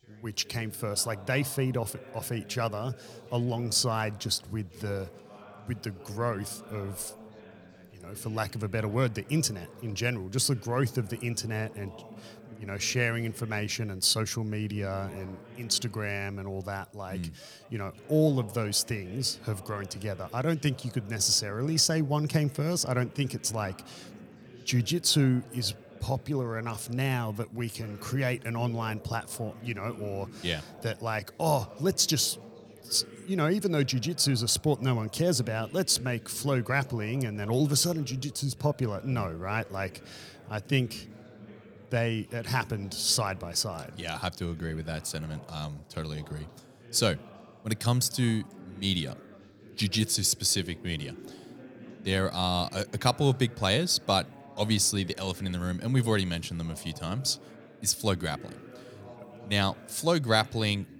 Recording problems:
background chatter; noticeable; throughout; 4 voices, 20 dB below the speech

